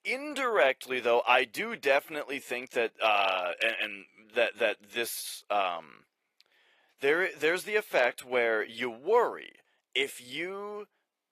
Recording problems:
thin; somewhat; fading below 550 Hz
garbled, watery; slightly; nothing above 15.5 kHz

